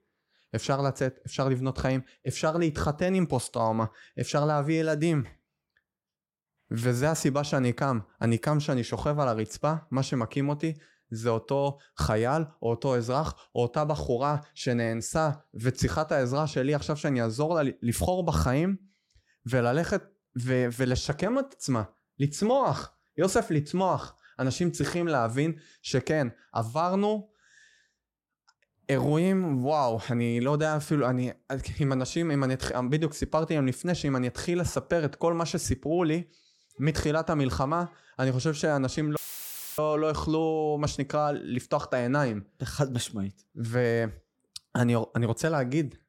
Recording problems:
audio cutting out; filled with static; at 39 s for 0.5 s

